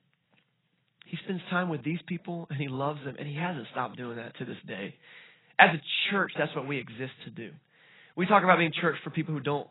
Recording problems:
garbled, watery; badly; nothing above 4 kHz

